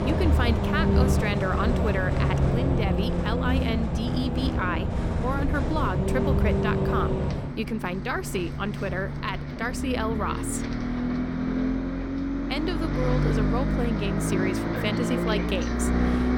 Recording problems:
traffic noise; very loud; throughout; 4 dB above the speech

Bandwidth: 17 kHz